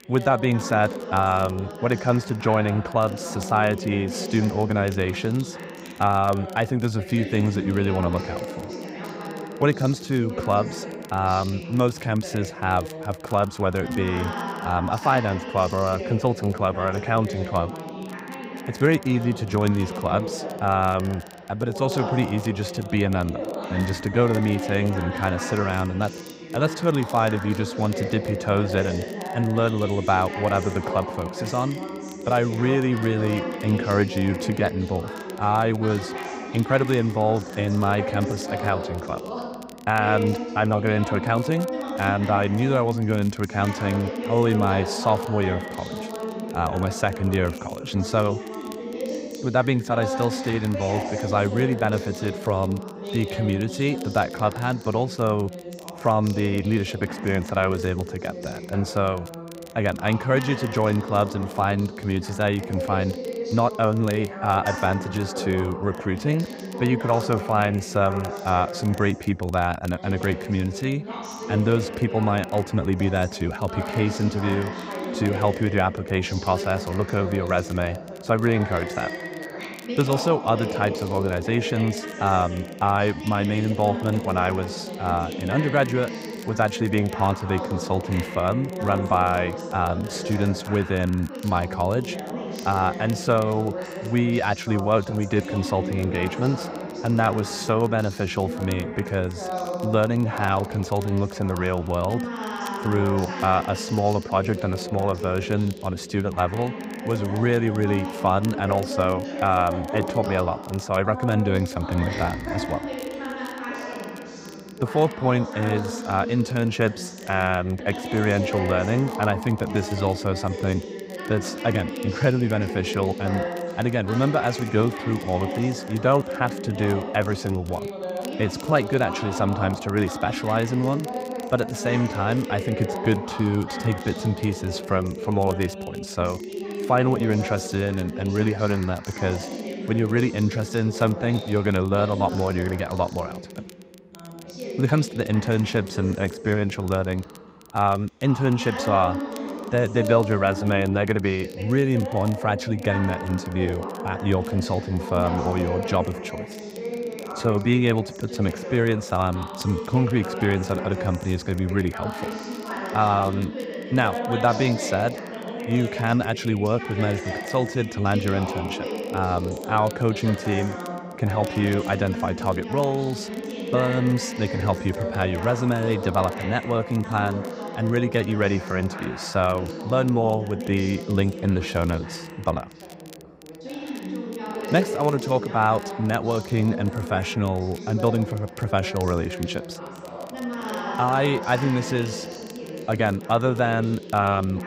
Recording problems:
background chatter; loud; throughout; 2 voices, 8 dB below the speech
crackle, like an old record; faint; 25 dB below the speech

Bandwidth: 15.5 kHz